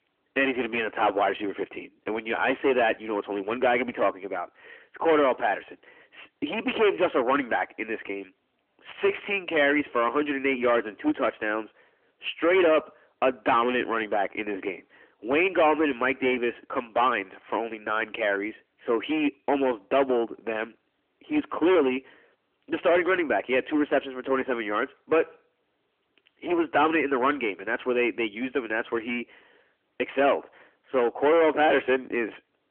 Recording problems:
distortion; heavy; 12% of the sound clipped
phone-call audio; nothing above 3 kHz

